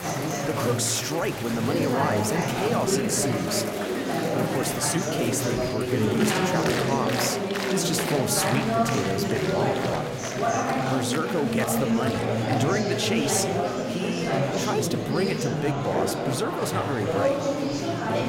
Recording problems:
chatter from many people; very loud; throughout; 2 dB above the speech

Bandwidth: 16 kHz